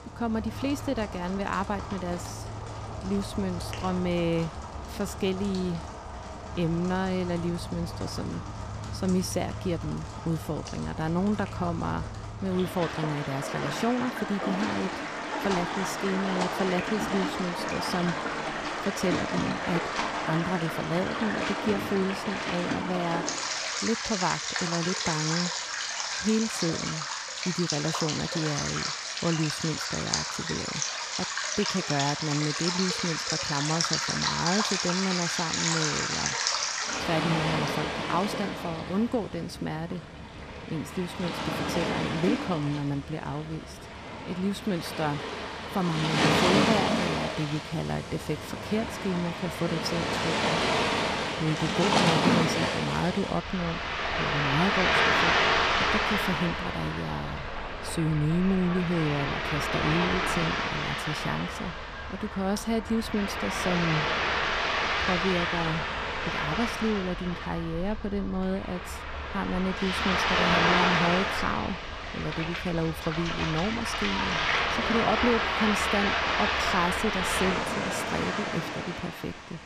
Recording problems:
rain or running water; very loud; throughout; 2 dB above the speech

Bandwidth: 14.5 kHz